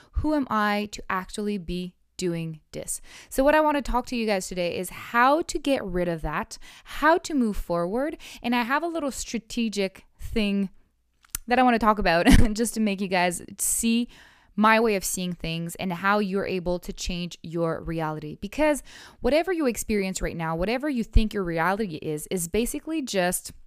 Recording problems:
none

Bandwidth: 15 kHz